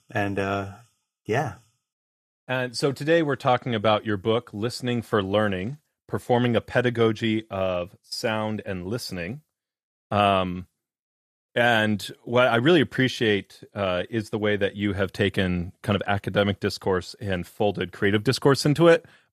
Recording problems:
none

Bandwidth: 14.5 kHz